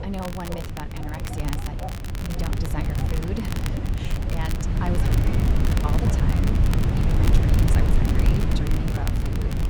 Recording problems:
wind noise on the microphone; heavy; 3 dB above the speech
crackle, like an old record; loud; 5 dB below the speech
animal sounds; noticeable; throughout; 10 dB below the speech

